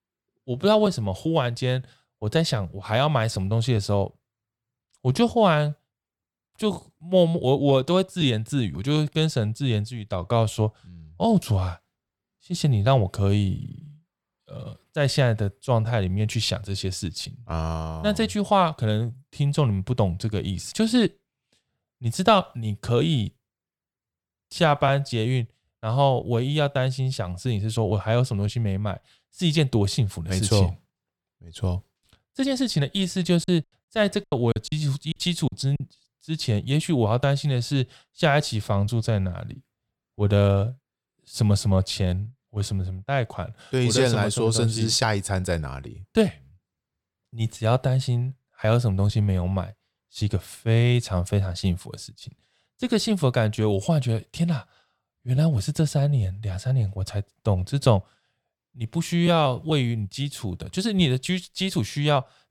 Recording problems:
choppy; very; from 33 to 36 s; 15% of the speech affected

